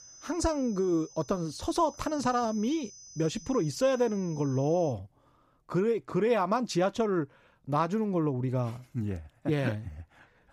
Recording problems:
high-pitched whine; noticeable; until 5 s; 6 kHz, 20 dB below the speech

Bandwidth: 15 kHz